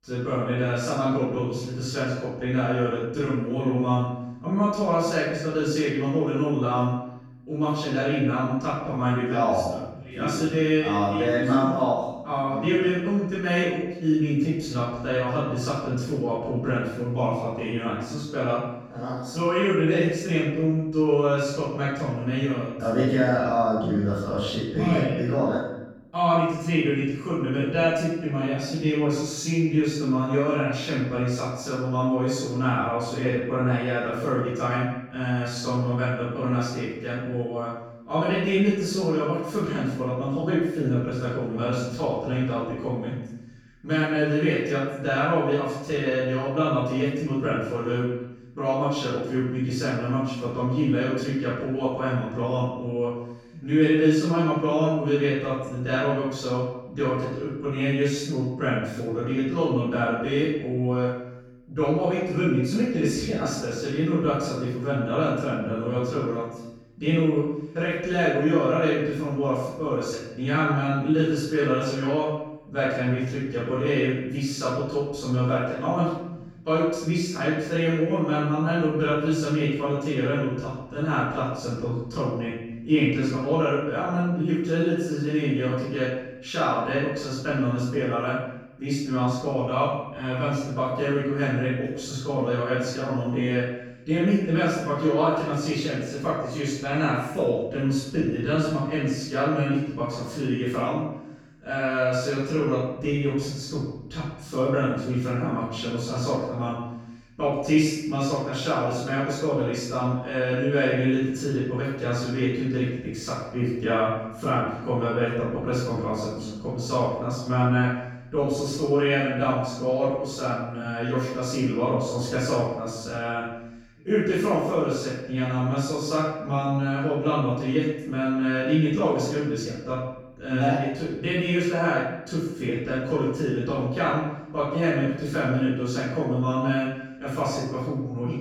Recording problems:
room echo; strong; dies away in 0.9 s
off-mic speech; far

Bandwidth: 18.5 kHz